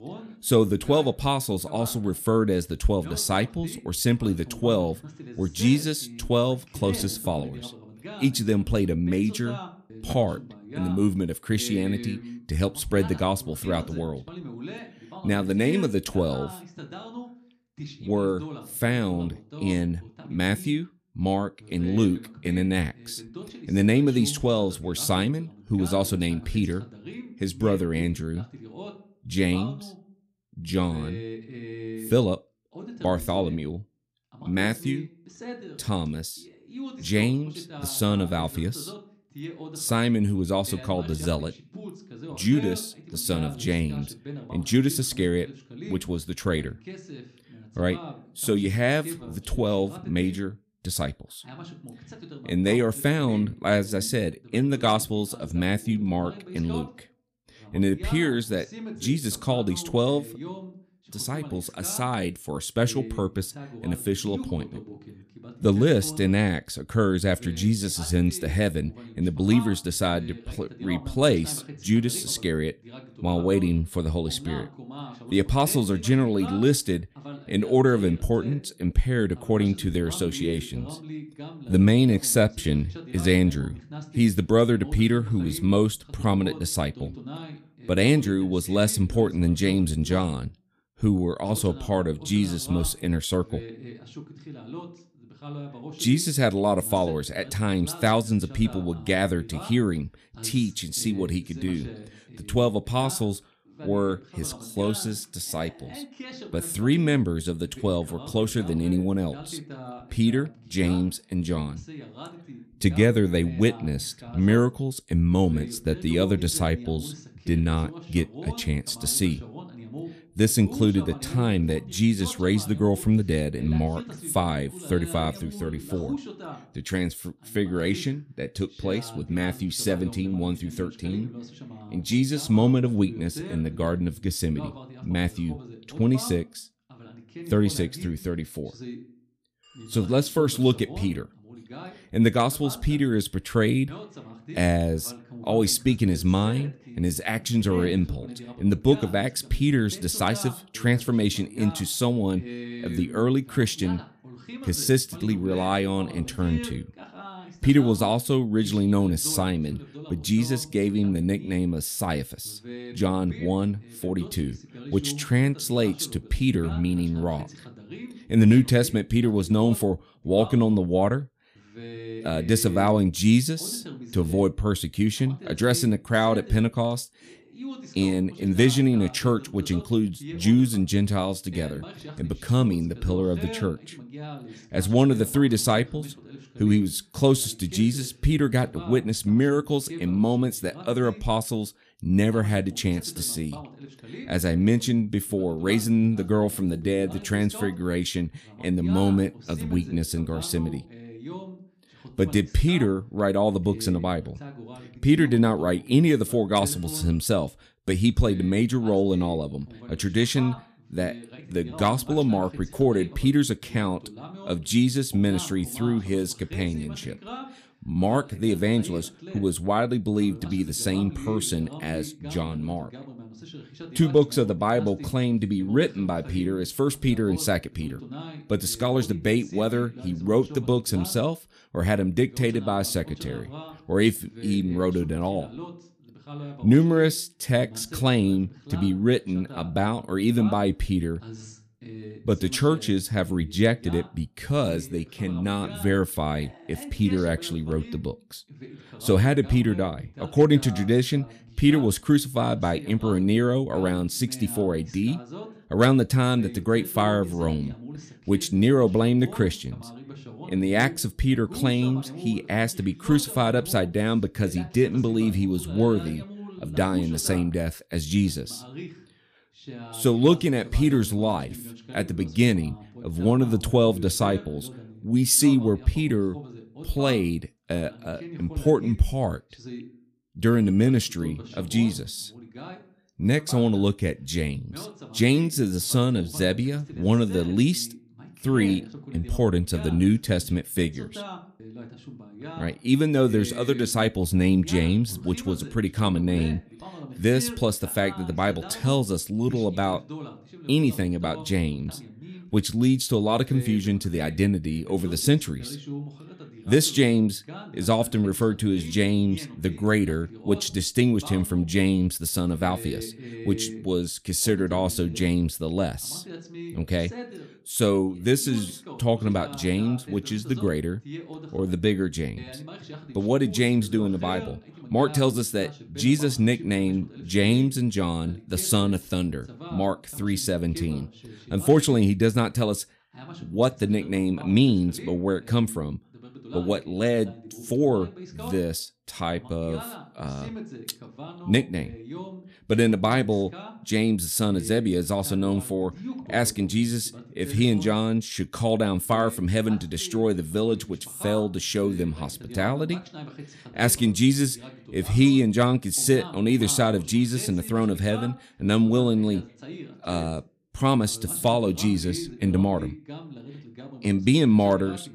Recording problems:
voice in the background; noticeable; throughout; 15 dB below the speech

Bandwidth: 14.5 kHz